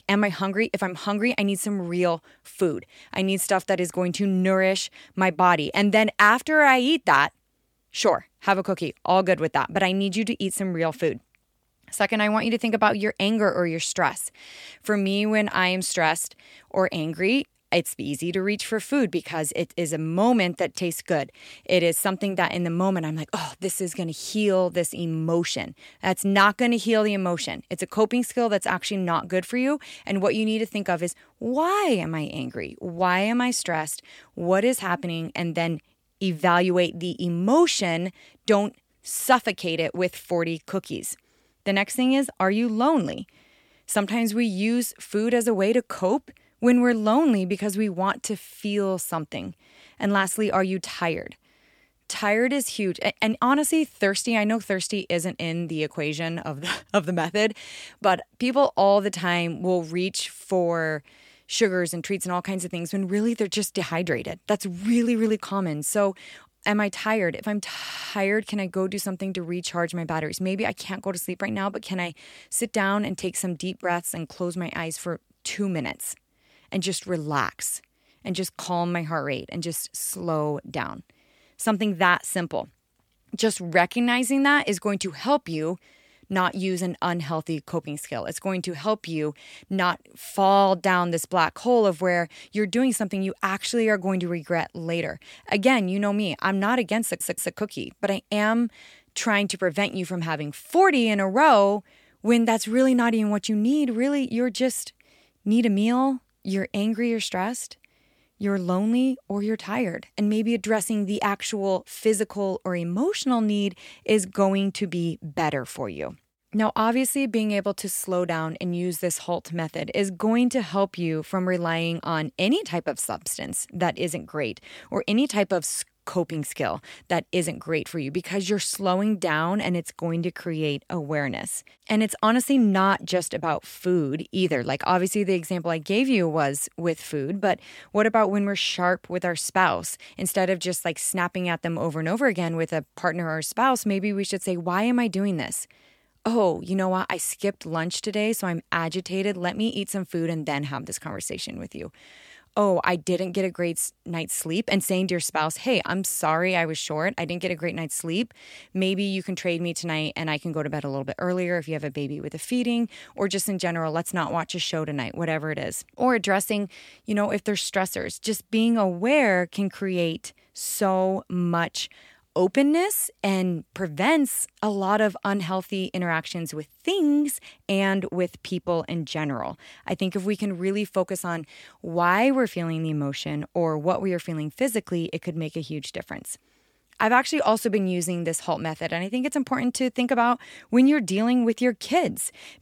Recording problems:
audio stuttering; at 1:08 and at 1:37

